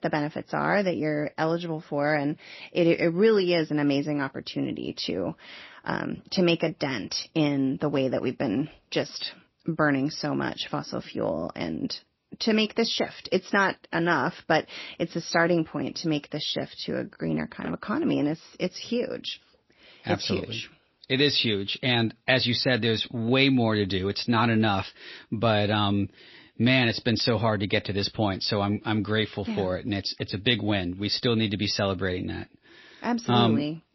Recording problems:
garbled, watery; slightly; nothing above 5.5 kHz

